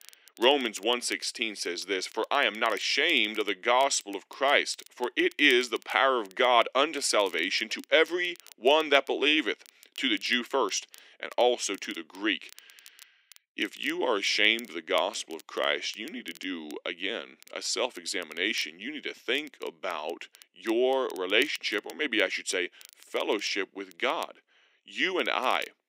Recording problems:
thin; somewhat; fading below 300 Hz
crackle, like an old record; faint; 25 dB below the speech

